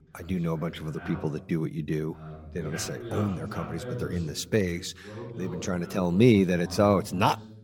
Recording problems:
voice in the background; noticeable; throughout; 15 dB below the speech

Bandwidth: 17 kHz